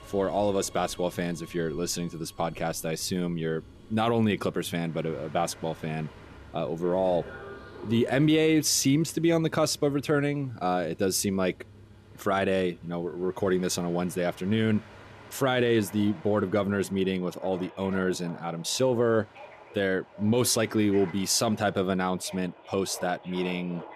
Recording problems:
train or aircraft noise; faint; throughout; 20 dB below the speech

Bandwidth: 14.5 kHz